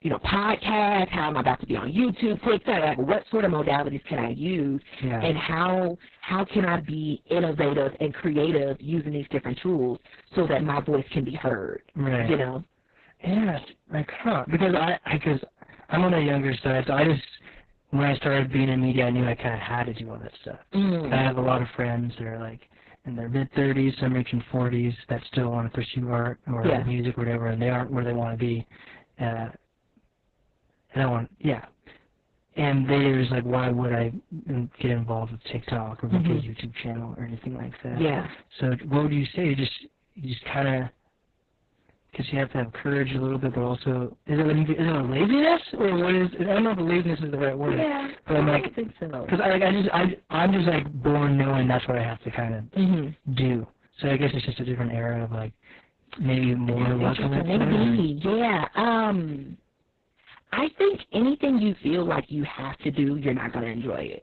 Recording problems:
garbled, watery; badly; nothing above 4 kHz
distortion; slight; 6% of the sound clipped
high-pitched whine; very faint; throughout; 750 Hz, 55 dB below the speech

